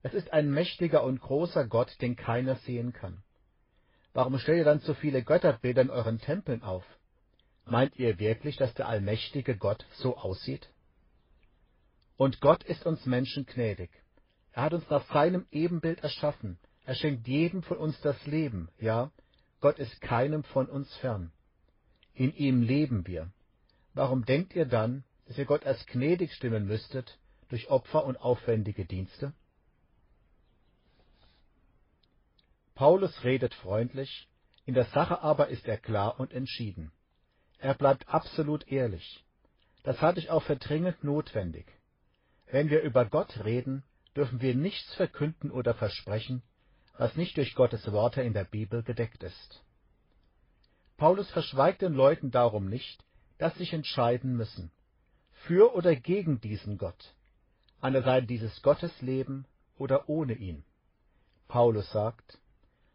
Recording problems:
garbled, watery; slightly; nothing above 5 kHz
high frequencies cut off; slight

